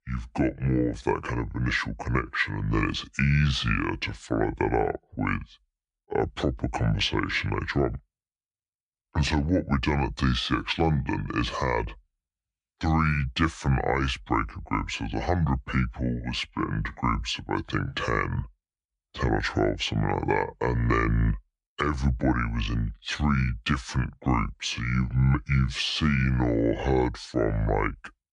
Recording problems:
wrong speed and pitch; too slow and too low; 0.7 times normal speed

